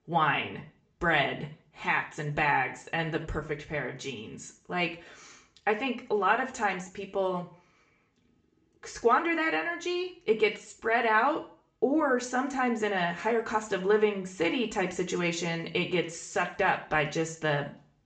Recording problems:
high frequencies cut off; noticeable; nothing above 8 kHz
room echo; very slight; dies away in 0.4 s
off-mic speech; somewhat distant

